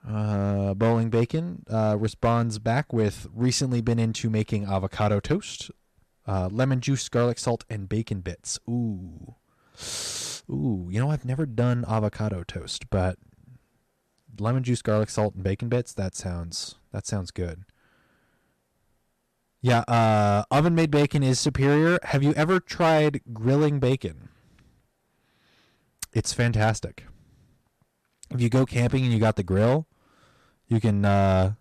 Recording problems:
distortion; slight; 5% of the sound clipped

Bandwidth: 13.5 kHz